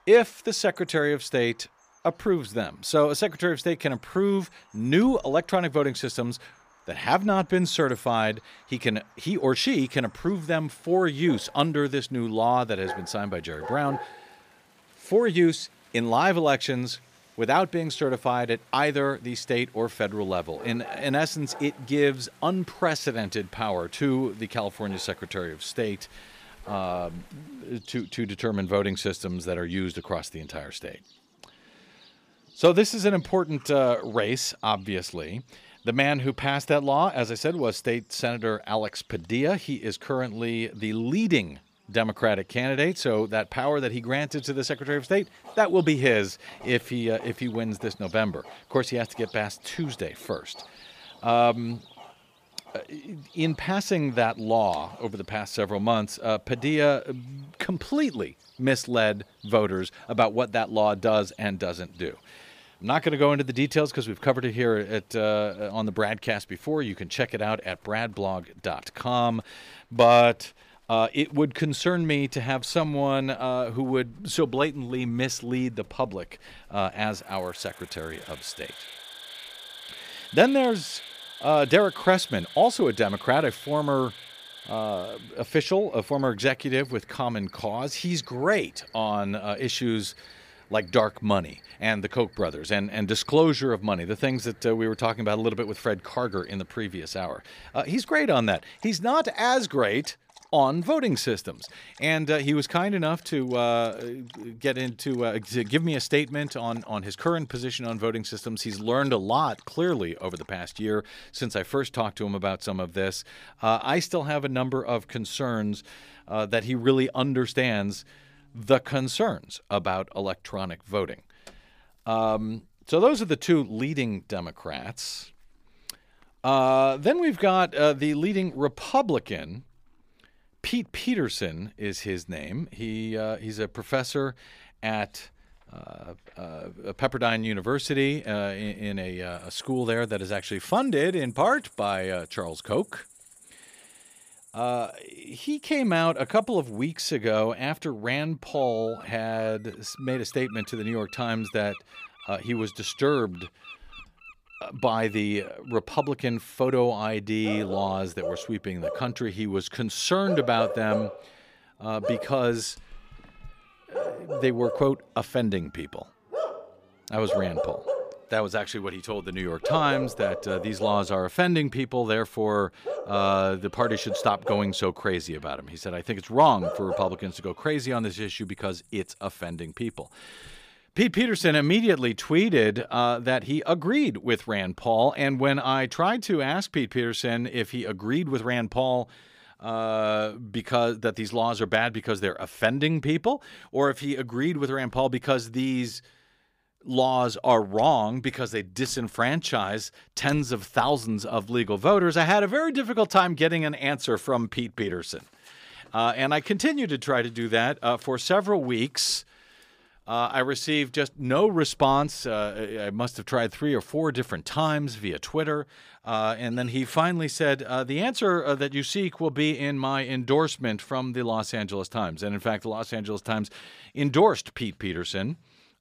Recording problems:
animal sounds; noticeable; until 3:01; 15 dB below the speech

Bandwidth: 15 kHz